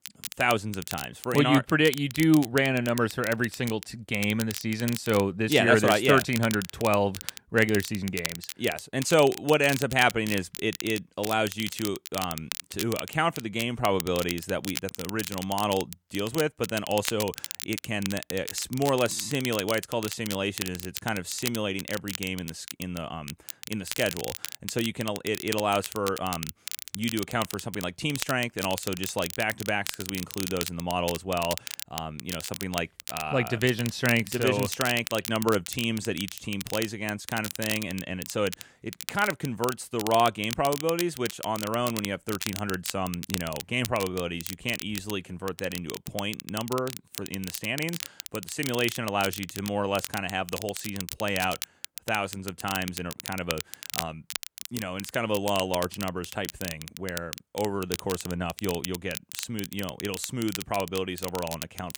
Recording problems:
crackle, like an old record; loud; 8 dB below the speech

